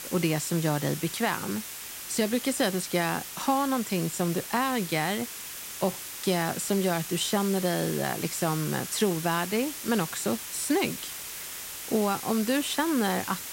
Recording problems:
hiss; loud; throughout; 7 dB below the speech

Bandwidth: 16 kHz